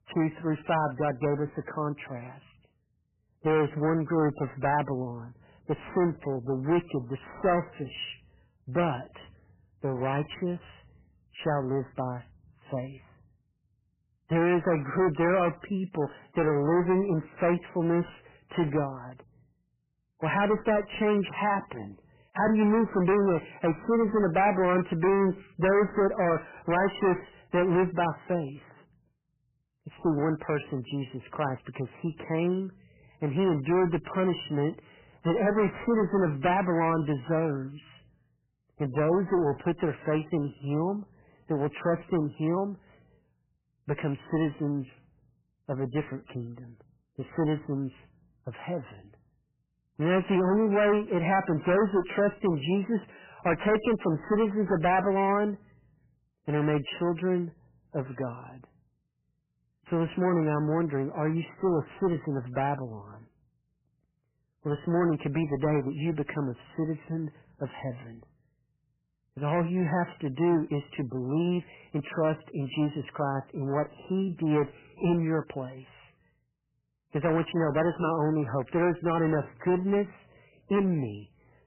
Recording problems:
distortion; heavy; 11% of the sound clipped
garbled, watery; badly; nothing above 3 kHz

